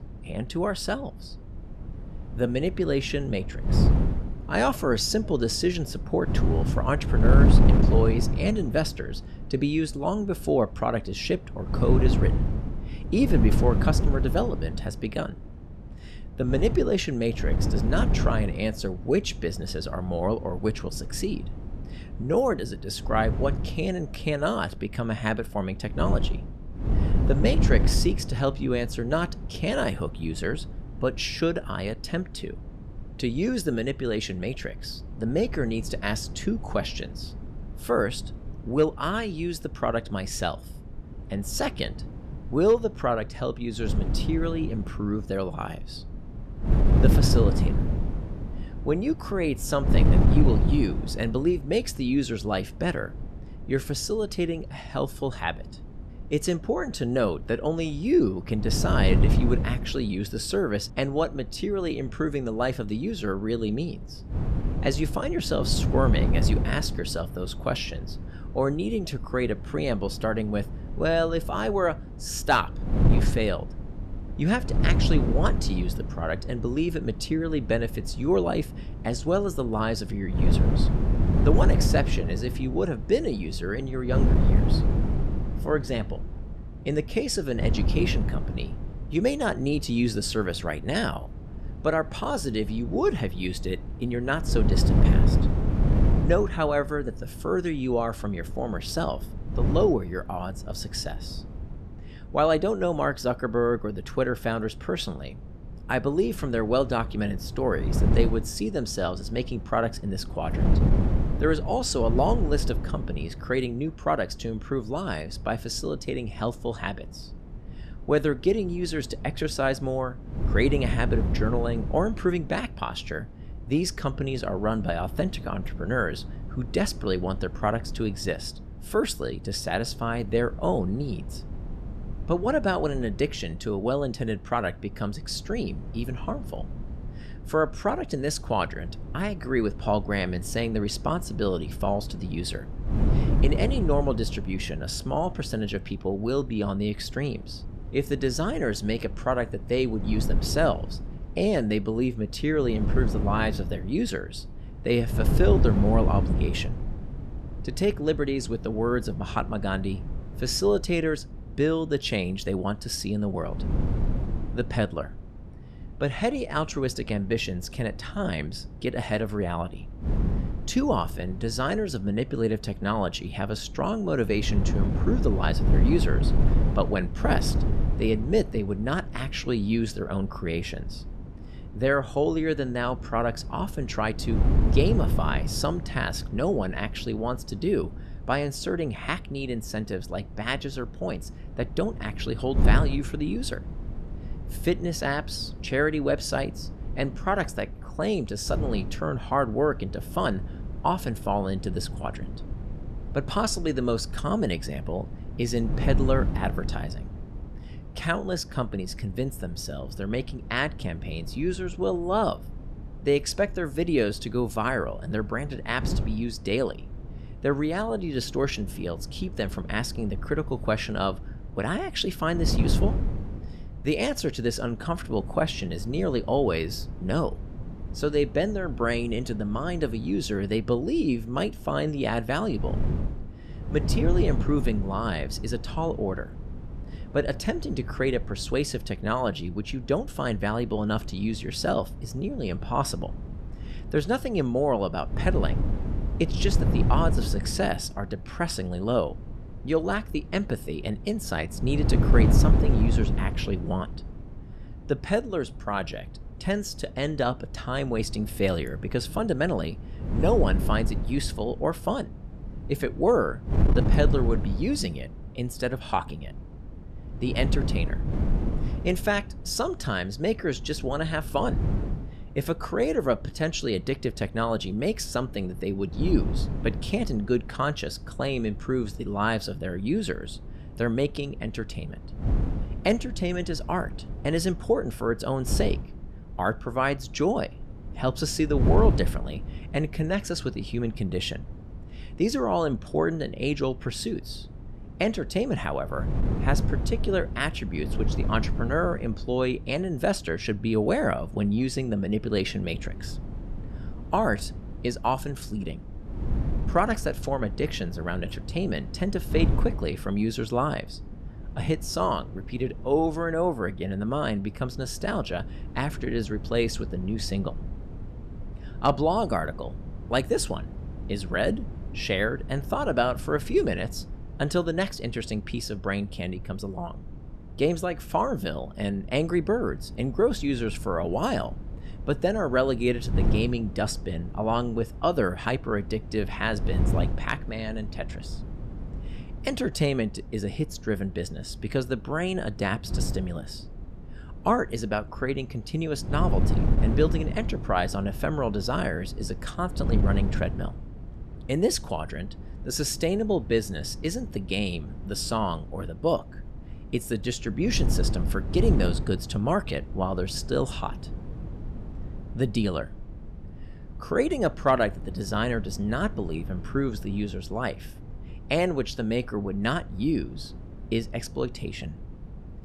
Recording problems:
wind noise on the microphone; occasional gusts; 10 dB below the speech

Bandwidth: 14 kHz